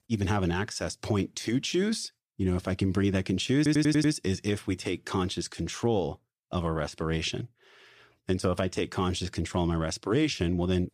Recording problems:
audio stuttering; at 3.5 s

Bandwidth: 14.5 kHz